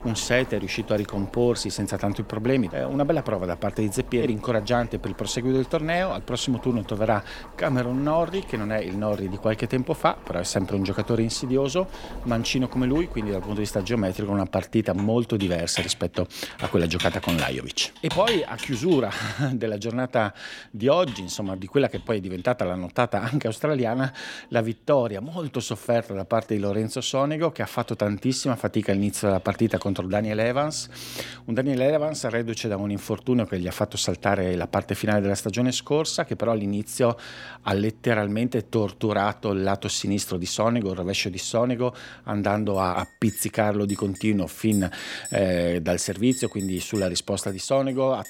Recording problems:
household noises; noticeable; throughout; 15 dB below the speech

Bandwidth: 16.5 kHz